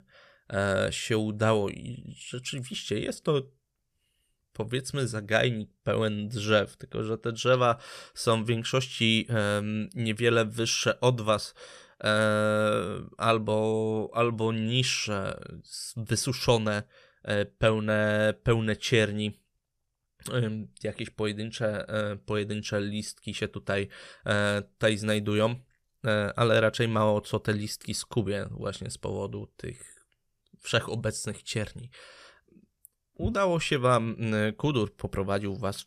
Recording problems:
none

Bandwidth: 14.5 kHz